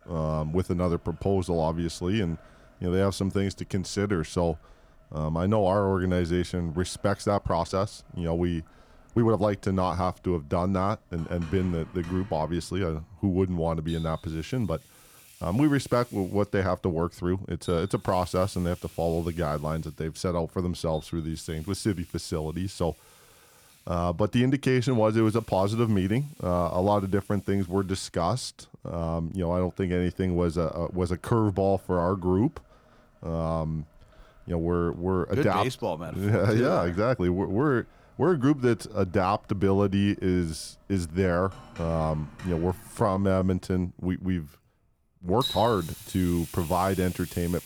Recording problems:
household noises; noticeable; throughout; 20 dB below the speech
uneven, jittery; strongly; from 7 to 46 s

